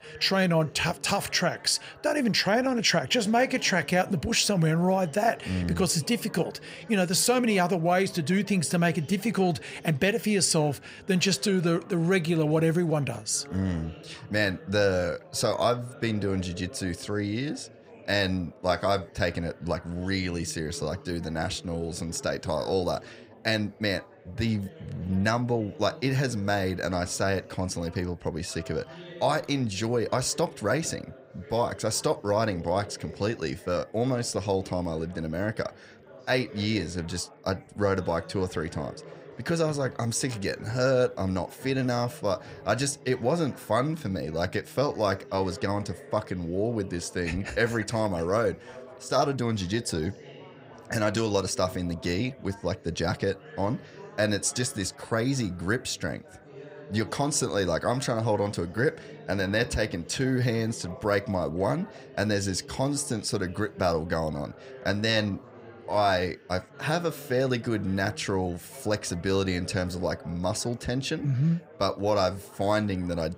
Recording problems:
chatter from many people; noticeable; throughout; 20 dB below the speech

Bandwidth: 15.5 kHz